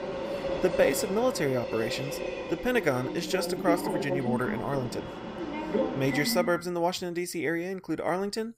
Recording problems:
train or aircraft noise; loud; until 6.5 s; 4 dB below the speech

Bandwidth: 15.5 kHz